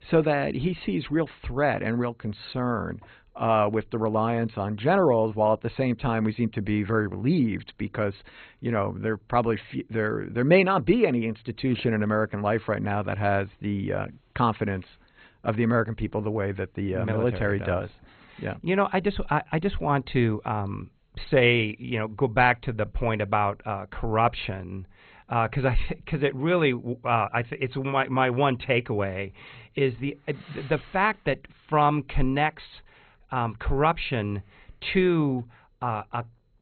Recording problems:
garbled, watery; badly; nothing above 4 kHz

